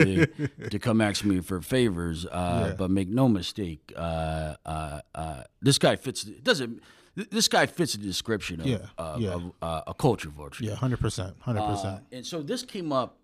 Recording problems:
abrupt cut into speech; at the start

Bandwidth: 14.5 kHz